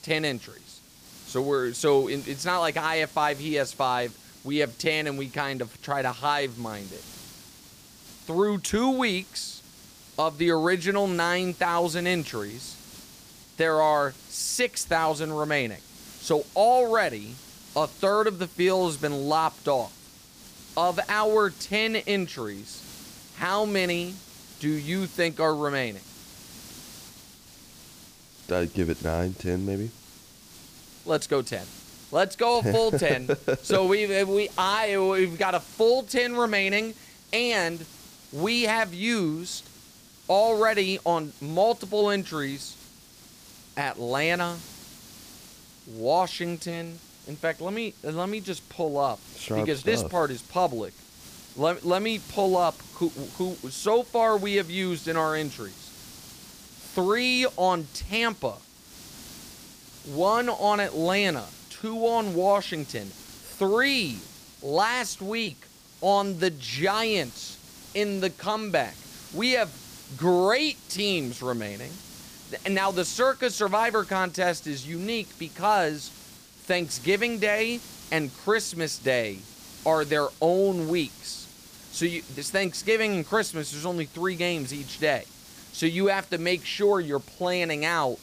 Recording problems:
hiss; noticeable; throughout; 20 dB below the speech

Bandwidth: 15 kHz